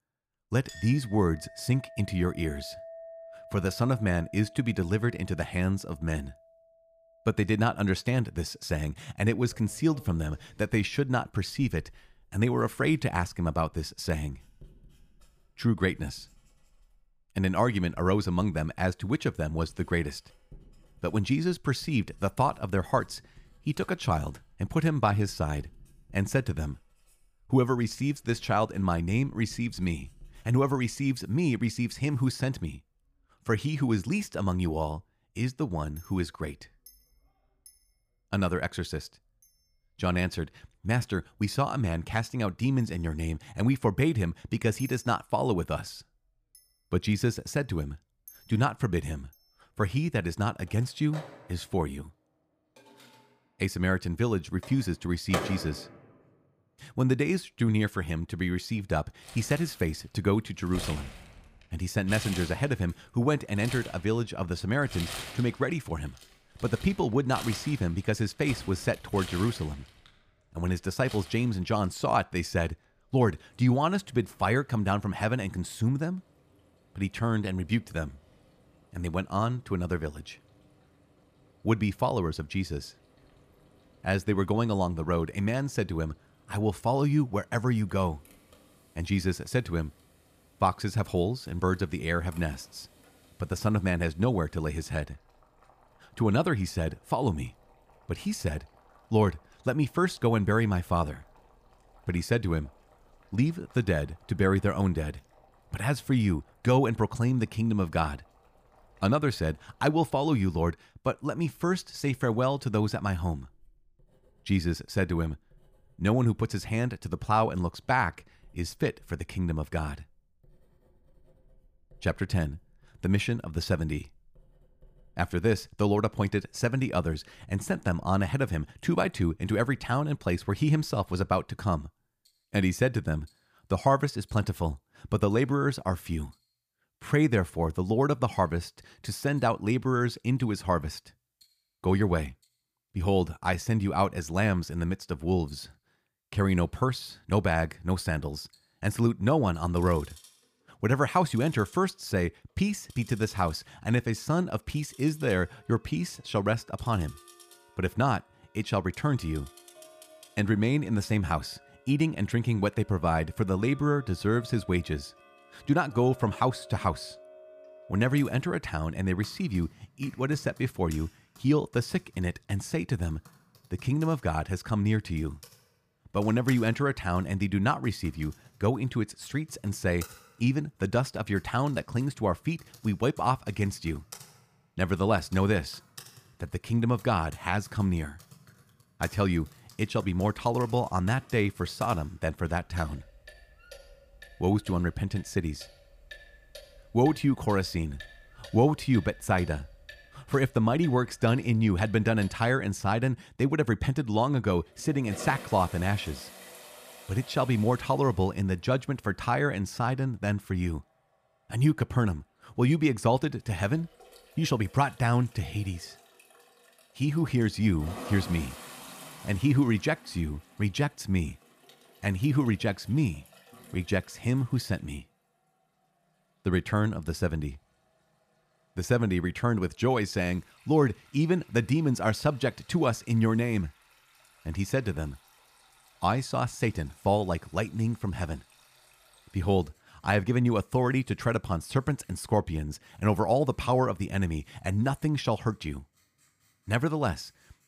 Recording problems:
household noises; faint; throughout; 20 dB below the speech

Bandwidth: 15 kHz